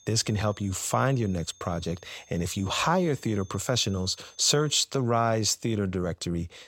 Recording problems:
high-pitched whine; faint; until 5 s; 6.5 kHz, 25 dB below the speech

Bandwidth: 16 kHz